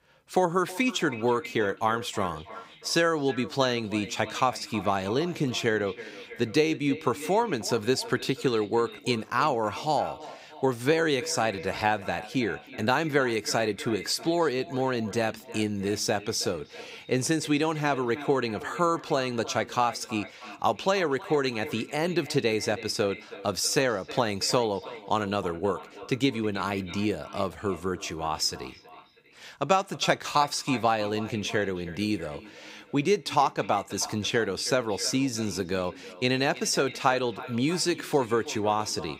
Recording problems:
echo of what is said; noticeable; throughout; 320 ms later, 15 dB below the speech

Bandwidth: 15.5 kHz